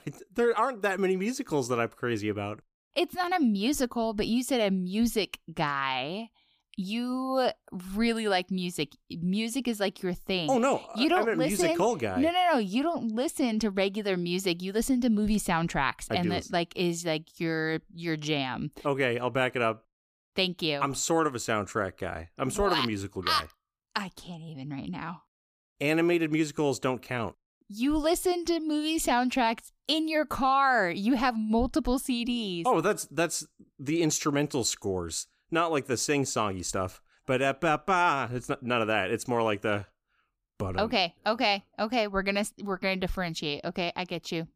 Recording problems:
none

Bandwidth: 15 kHz